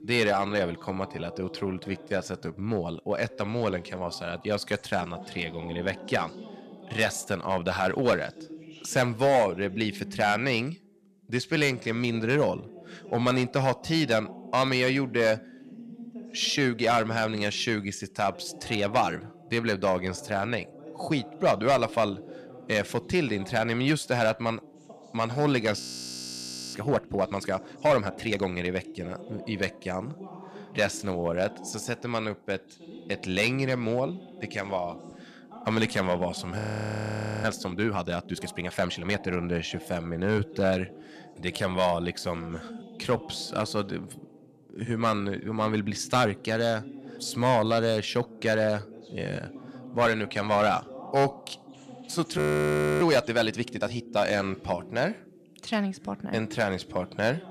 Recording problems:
distortion; slight; 1.9% of the sound clipped
voice in the background; noticeable; throughout; 15 dB below the speech
audio freezing; at 26 s for 1 s, at 37 s for 1 s and at 52 s for 0.5 s

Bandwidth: 14 kHz